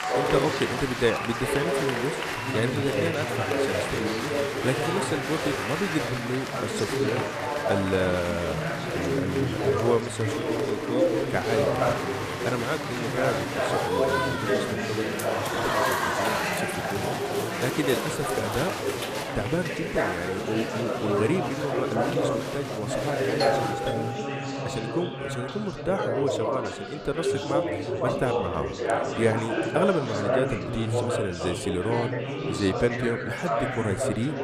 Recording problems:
chatter from many people; very loud; throughout; 3 dB above the speech
doorbell; loud; from 23 to 25 s; peak level with the speech

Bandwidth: 14.5 kHz